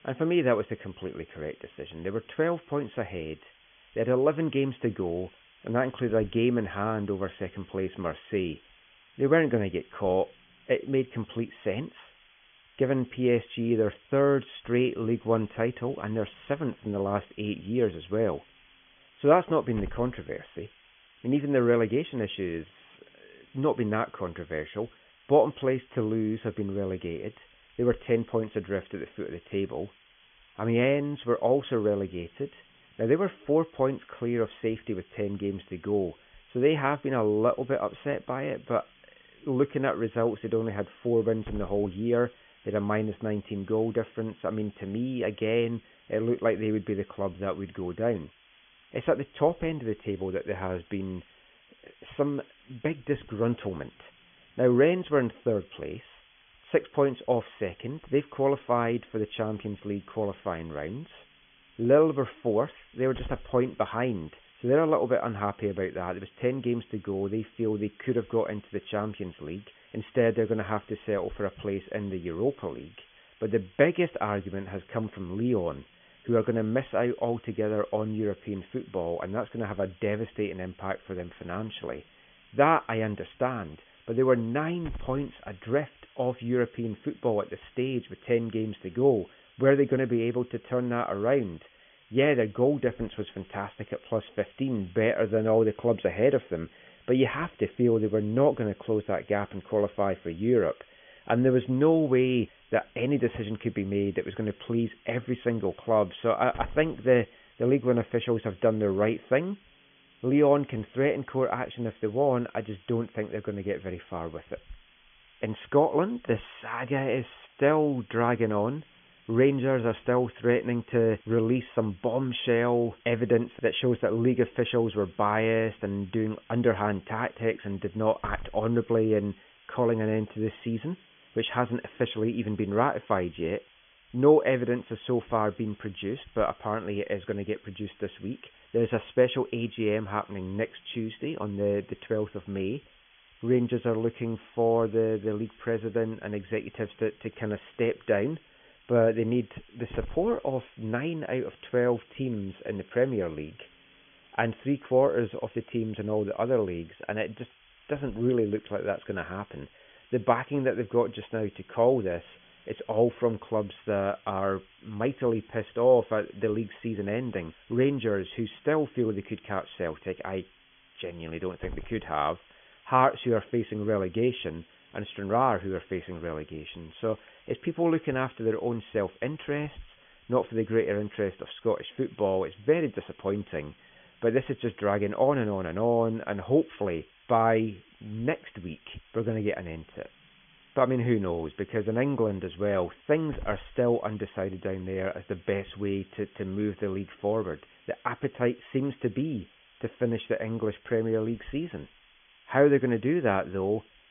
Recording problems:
high frequencies cut off; severe; nothing above 3.5 kHz
hiss; faint; throughout; 25 dB below the speech

